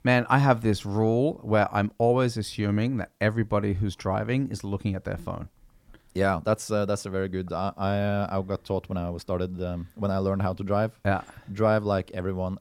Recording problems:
none

